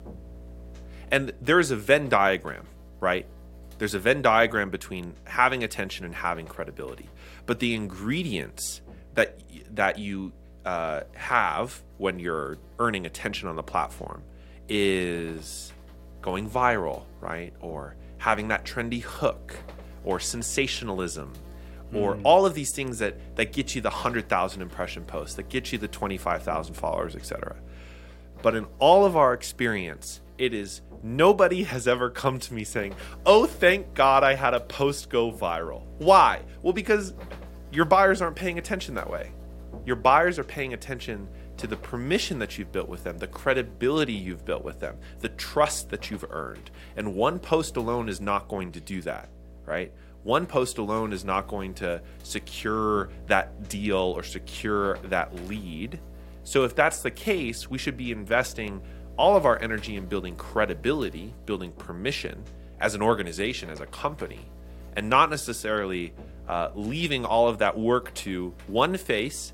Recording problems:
electrical hum; faint; throughout; 60 Hz, 25 dB below the speech

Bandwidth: 16 kHz